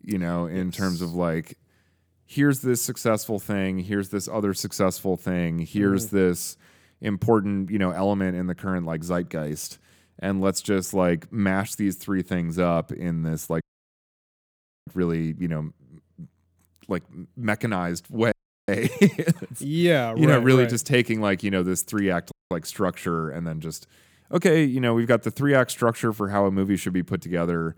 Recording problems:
audio cutting out; at 14 s for 1.5 s, at 18 s and at 22 s

